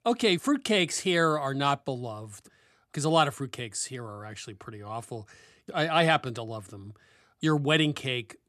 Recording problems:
none

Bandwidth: 13.5 kHz